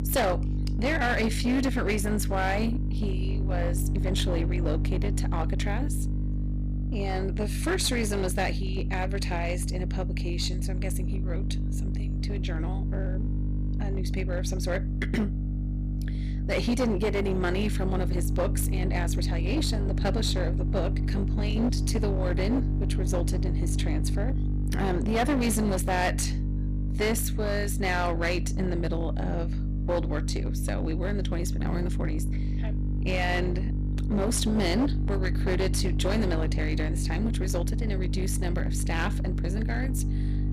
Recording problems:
distortion; slight; 17% of the sound clipped
electrical hum; loud; throughout; 50 Hz, 9 dB below the speech

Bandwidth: 14.5 kHz